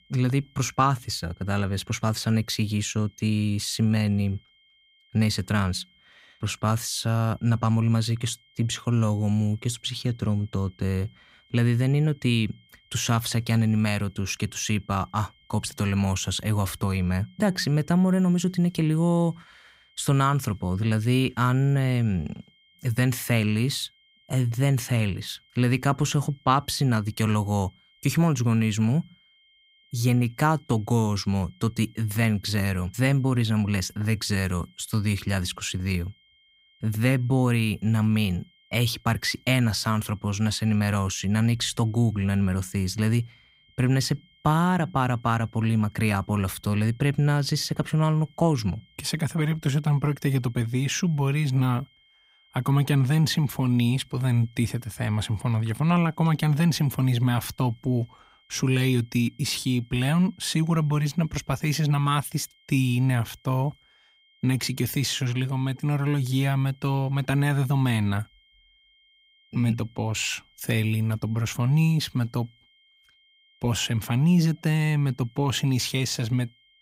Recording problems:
high-pitched whine; faint; throughout; 3 kHz, 35 dB below the speech

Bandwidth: 15.5 kHz